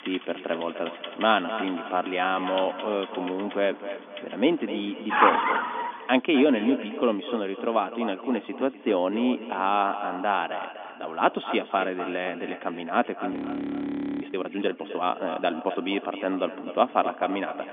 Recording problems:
echo of what is said; strong; throughout; 250 ms later, 10 dB below the speech
phone-call audio; nothing above 3.5 kHz
traffic noise; loud; until 5.5 s; 1 dB below the speech
audio freezing; at 13 s for 1 s

